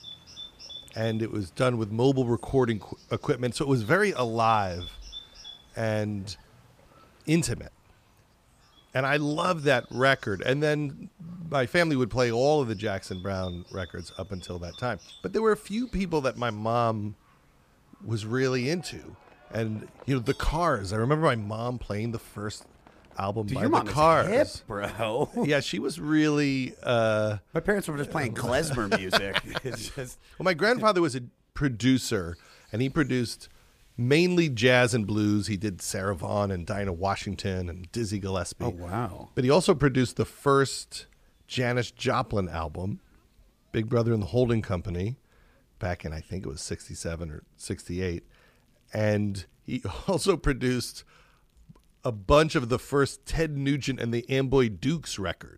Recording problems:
animal sounds; faint; throughout; 20 dB below the speech

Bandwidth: 15 kHz